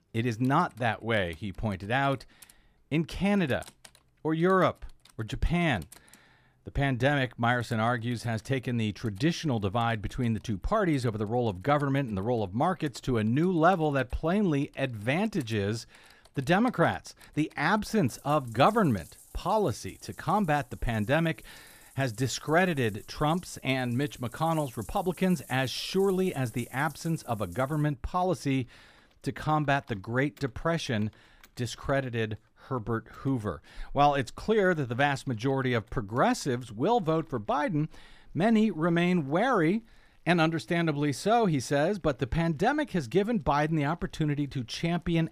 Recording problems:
household noises; faint; throughout; 25 dB below the speech

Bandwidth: 15 kHz